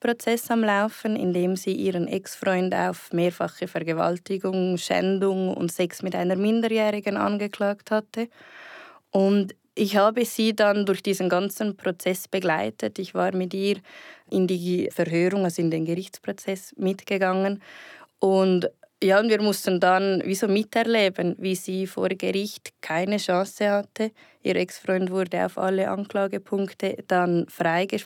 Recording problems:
none

